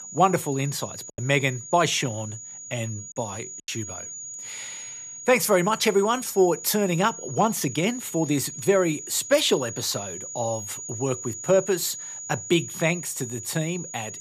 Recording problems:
high-pitched whine; noticeable; throughout; 7 kHz, 10 dB below the speech
choppy; very; at 1 s and at 3.5 s; 9% of the speech affected

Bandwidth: 14.5 kHz